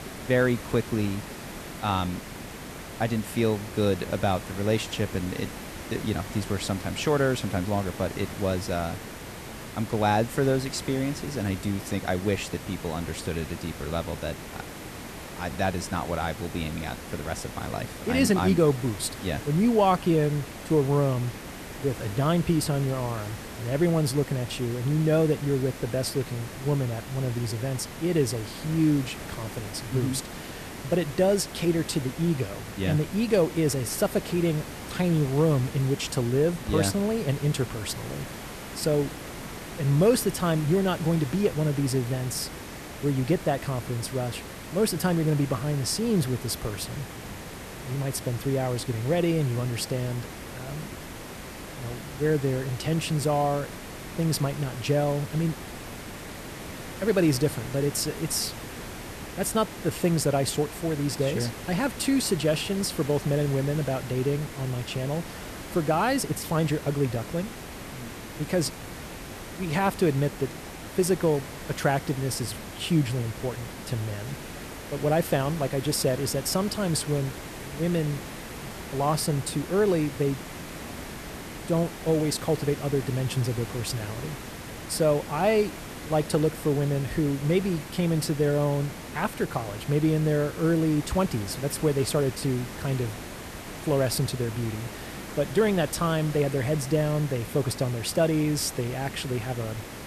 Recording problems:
hiss; noticeable; throughout; 10 dB below the speech

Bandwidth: 14 kHz